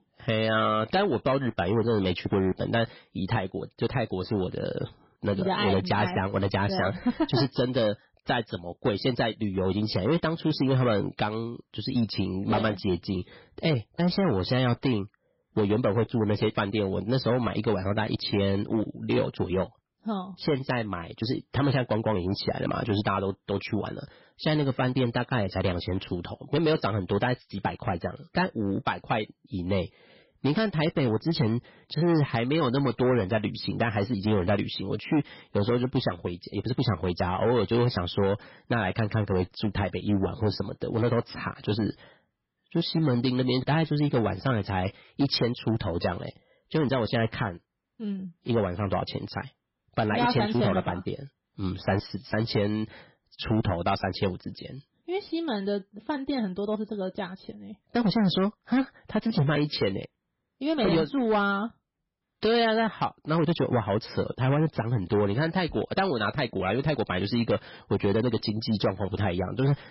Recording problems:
garbled, watery; badly; nothing above 5.5 kHz
distortion; slight; 6% of the sound clipped

